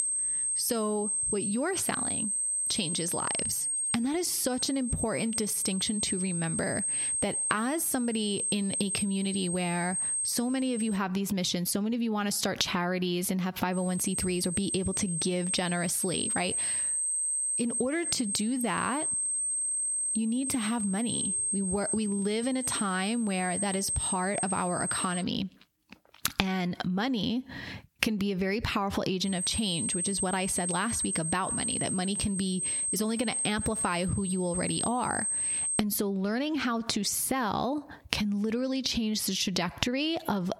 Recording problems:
squashed, flat; heavily
high-pitched whine; loud; until 11 s, from 14 to 25 s and from 29 to 36 s; 8.5 kHz, as loud as the speech

